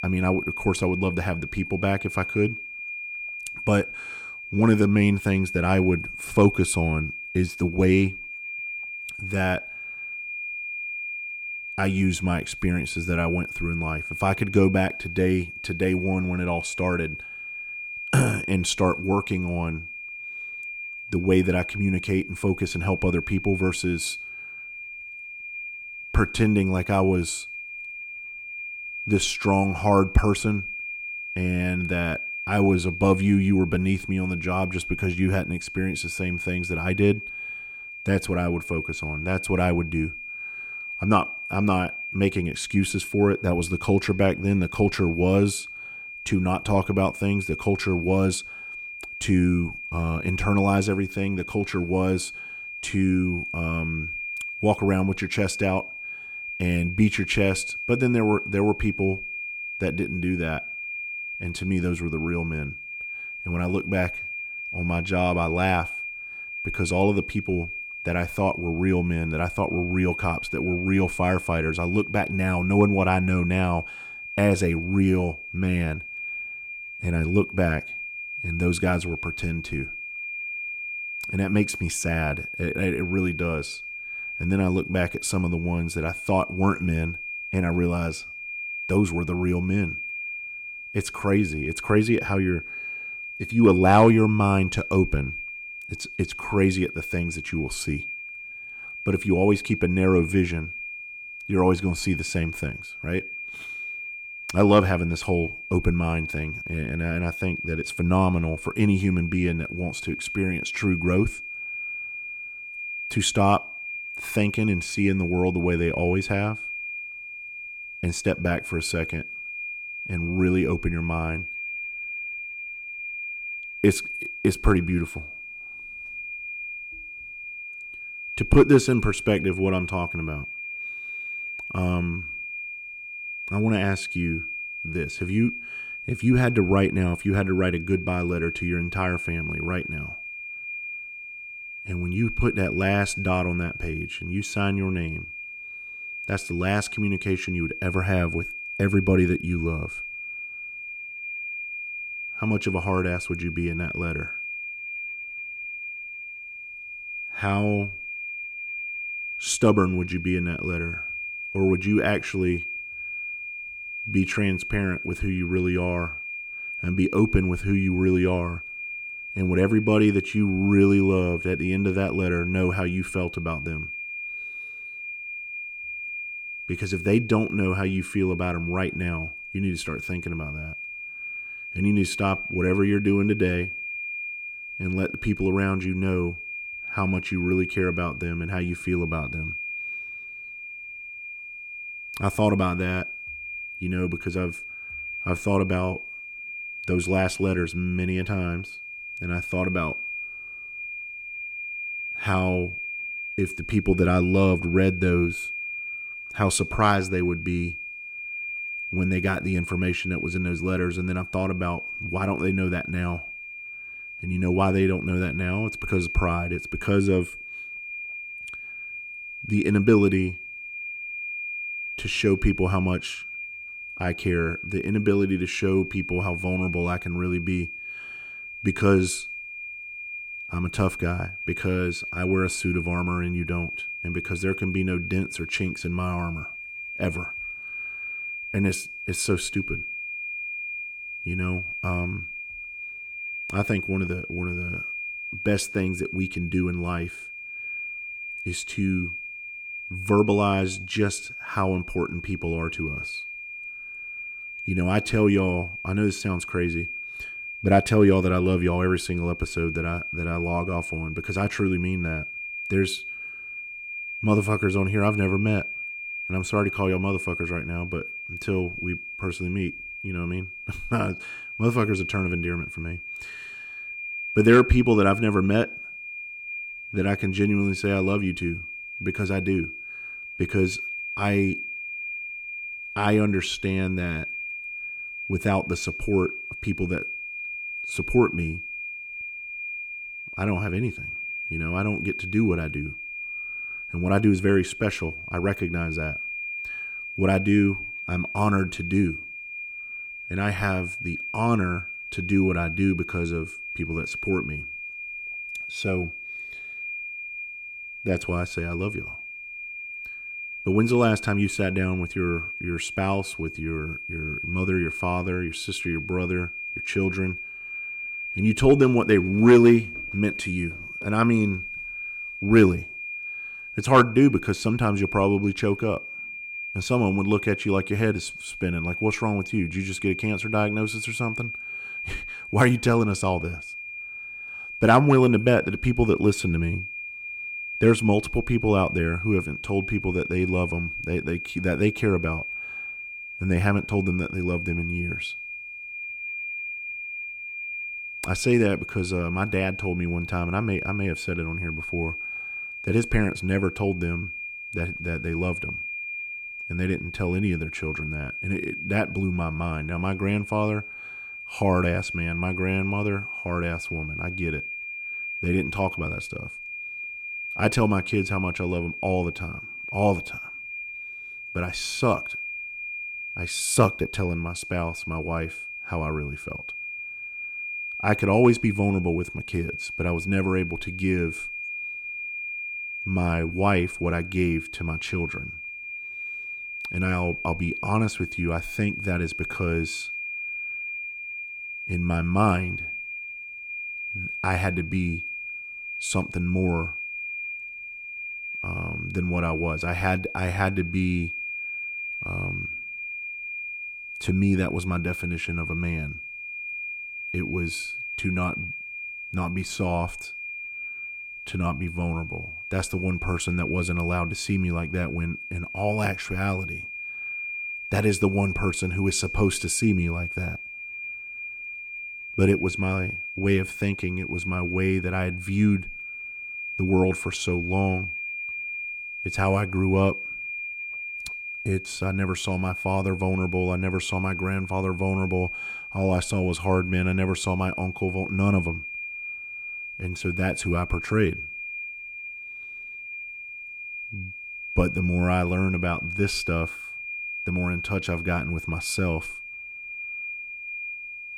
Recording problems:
high-pitched whine; loud; throughout; 2.5 kHz, 7 dB below the speech

